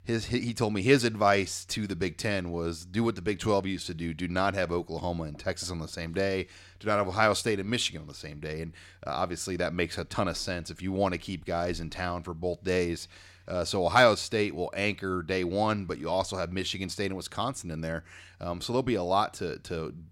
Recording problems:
none

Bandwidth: 16 kHz